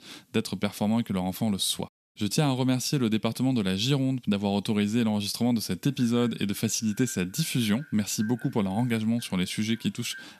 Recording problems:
echo of what is said; faint; from 6 s on; 400 ms later, 25 dB below the speech

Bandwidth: 14.5 kHz